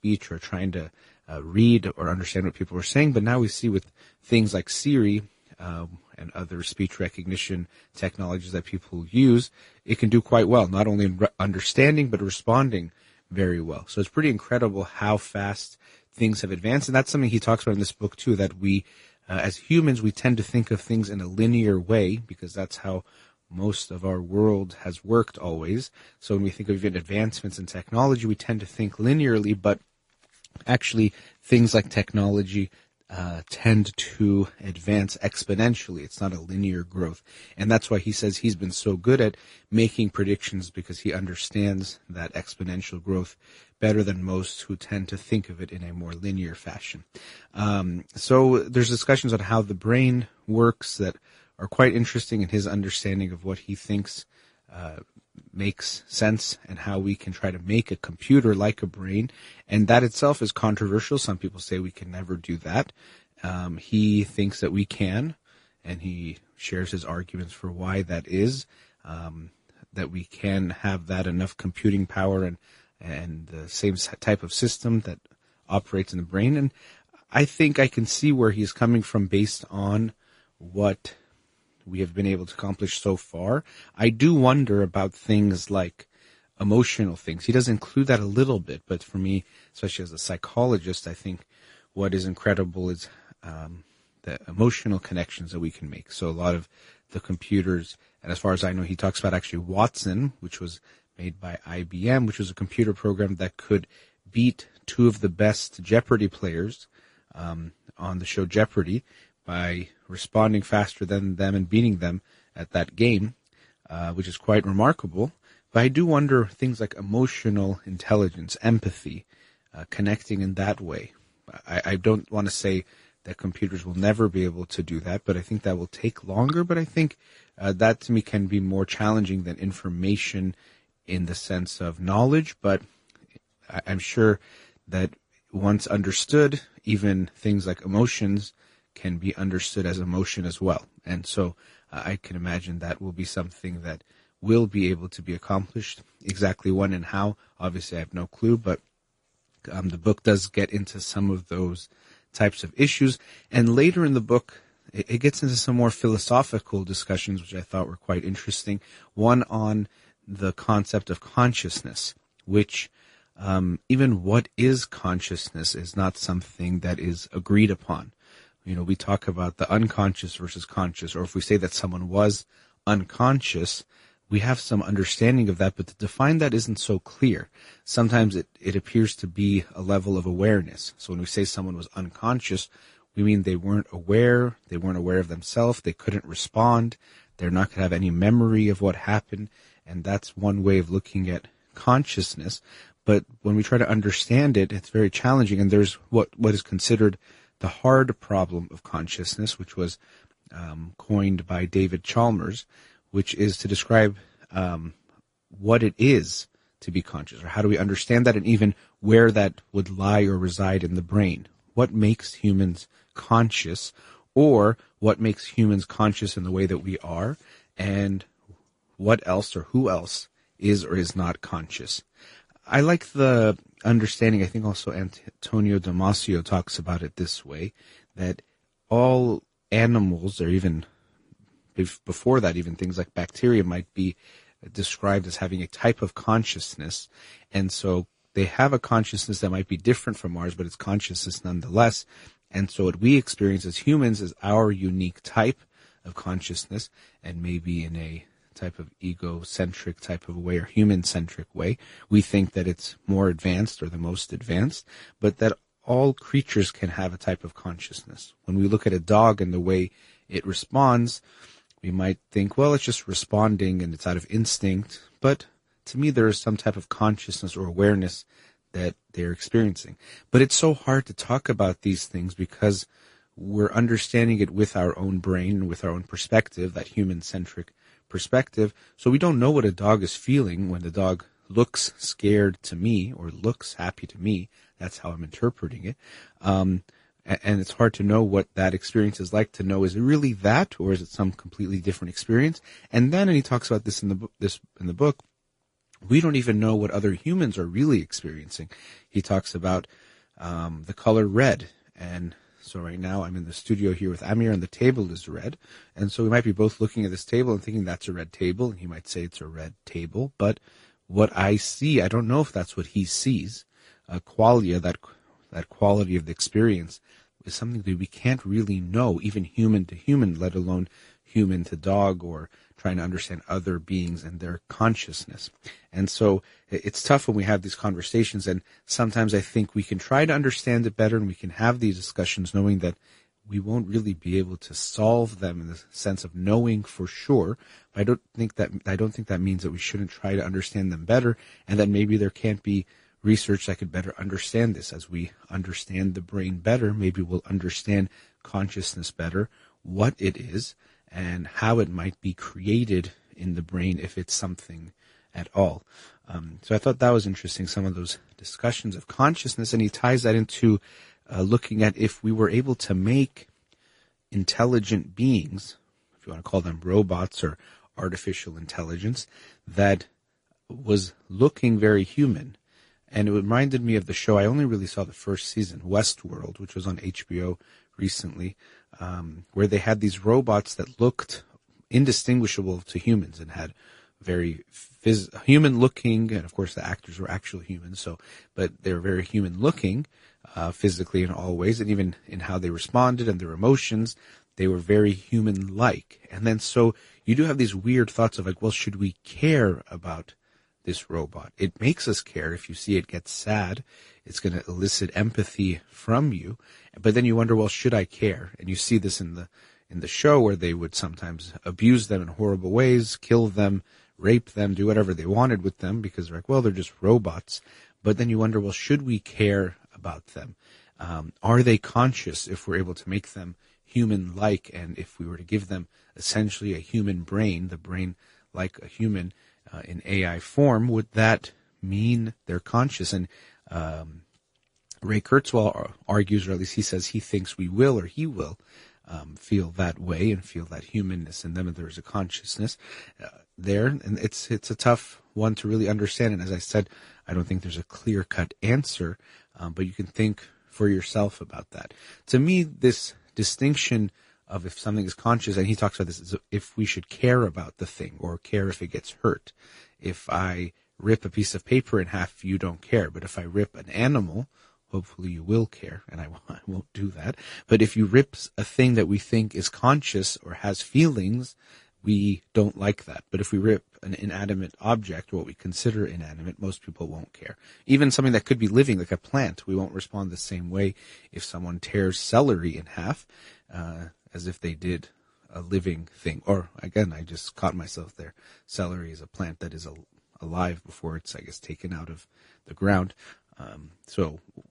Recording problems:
garbled, watery; slightly; nothing above 10.5 kHz

